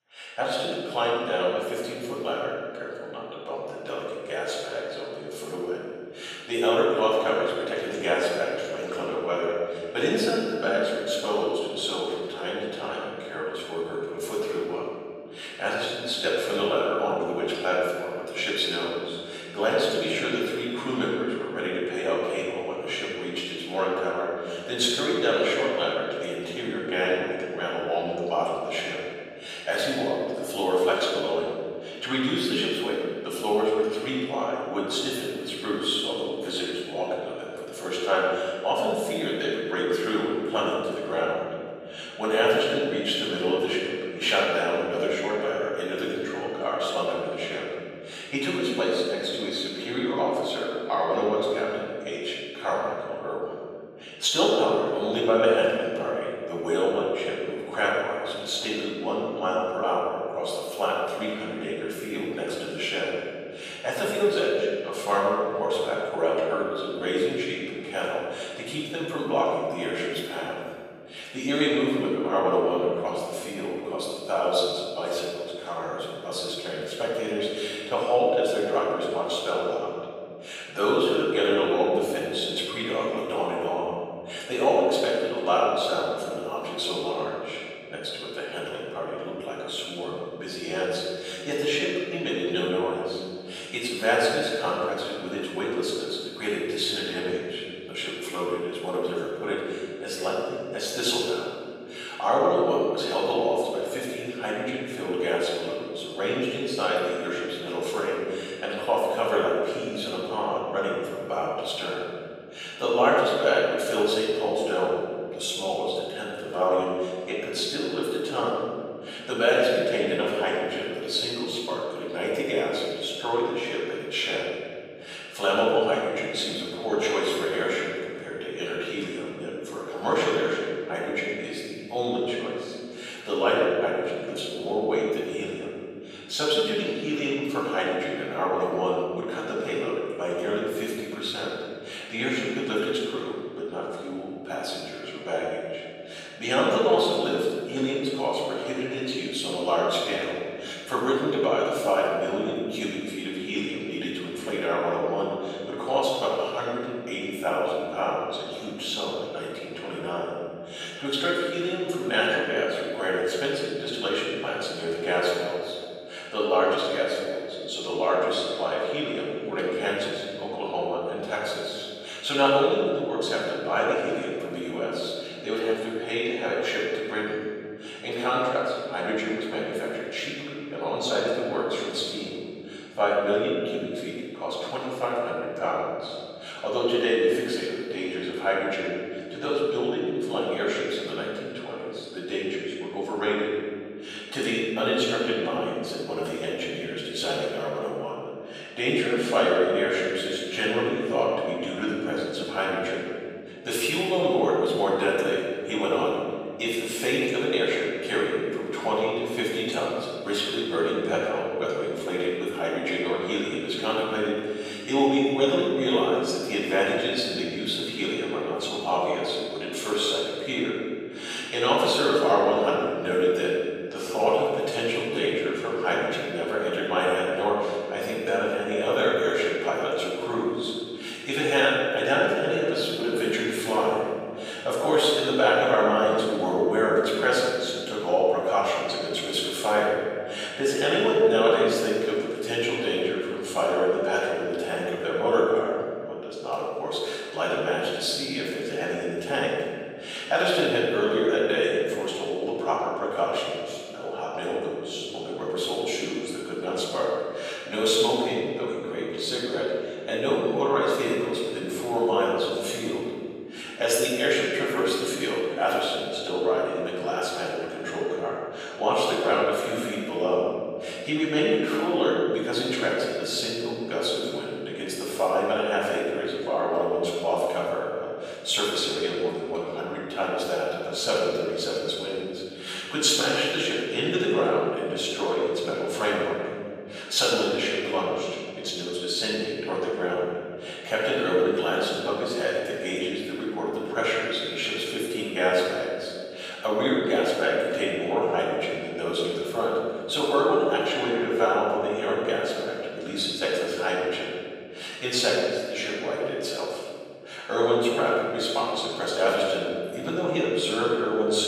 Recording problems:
room echo; strong; dies away in 2.6 s
off-mic speech; far
thin; somewhat; fading below 550 Hz

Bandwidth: 15 kHz